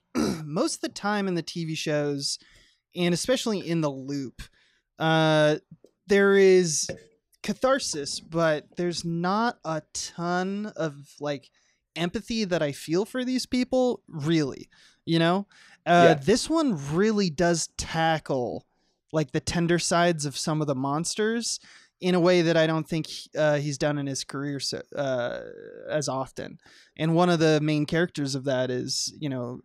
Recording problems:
none

